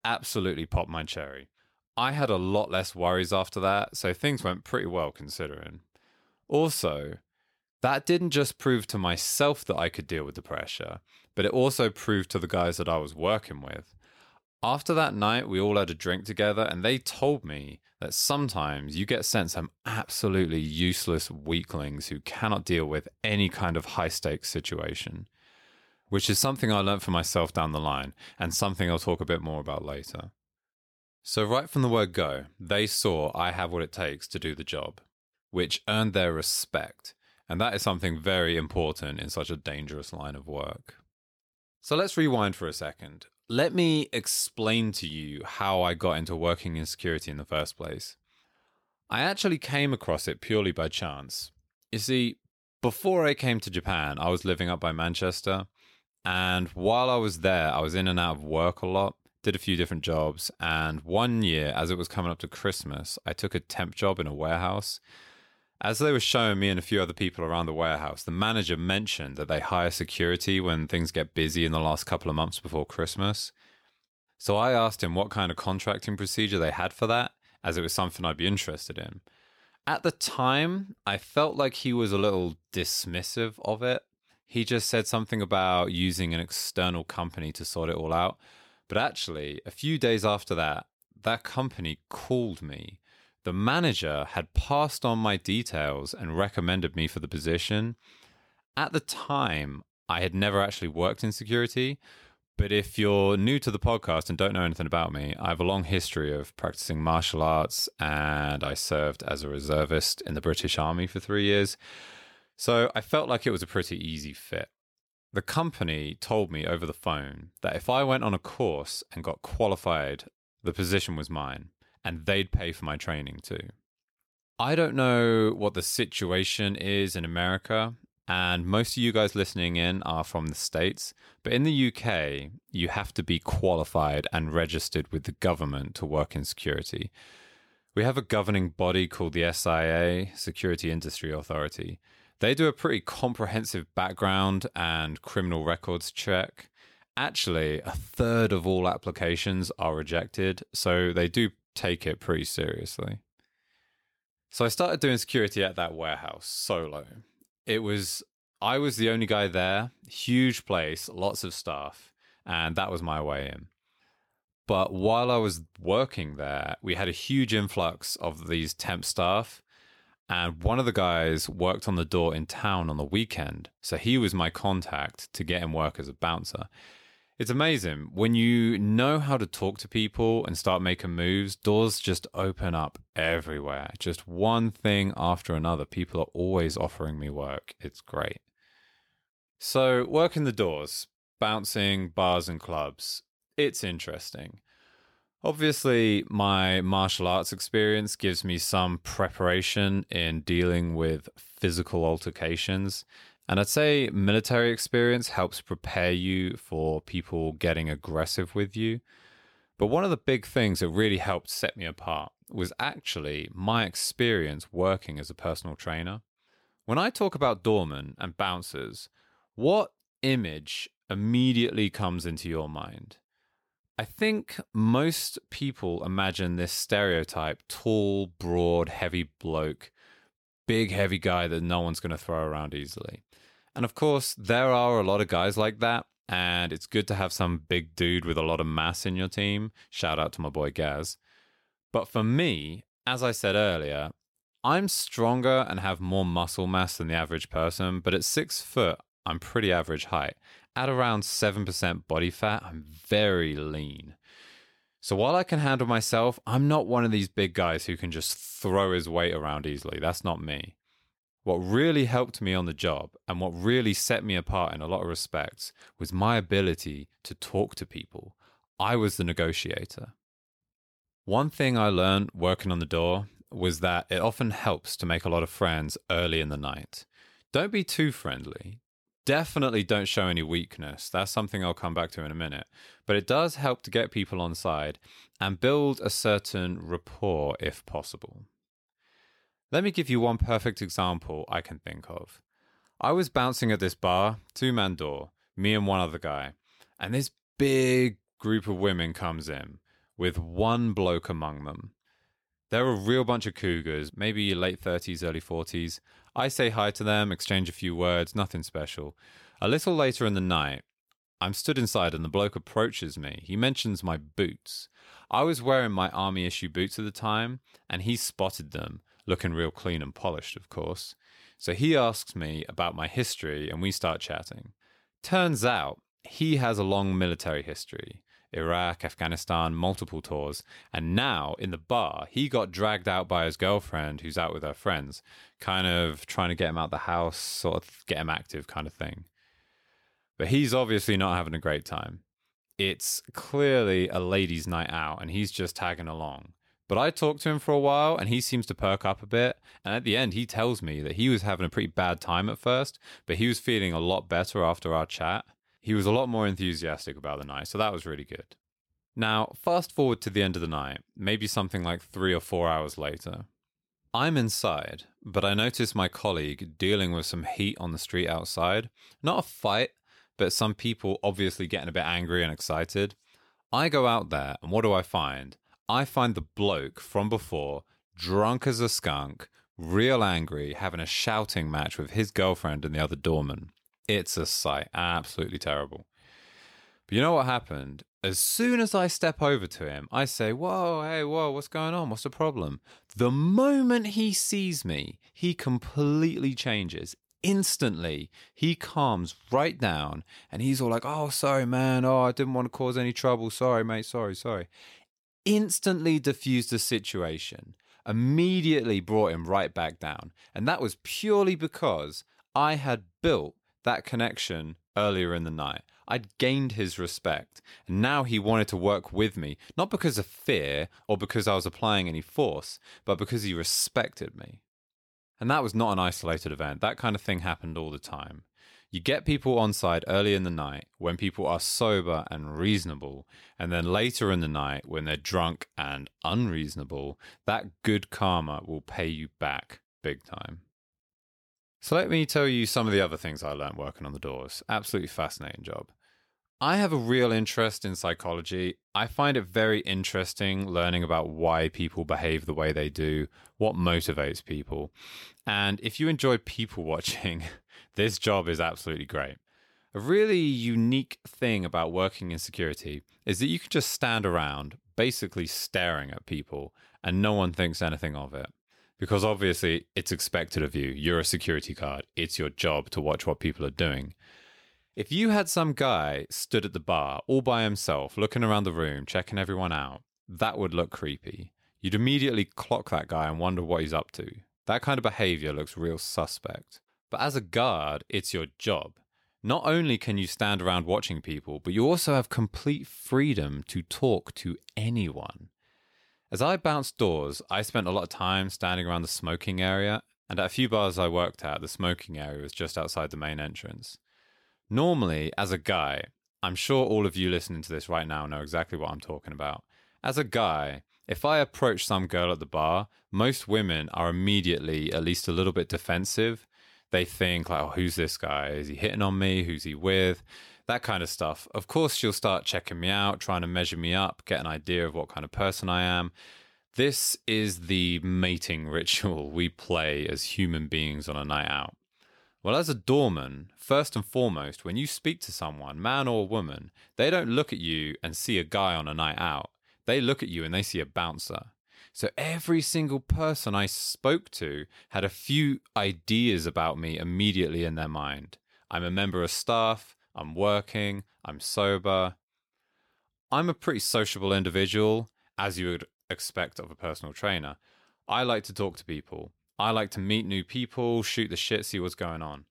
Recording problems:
none

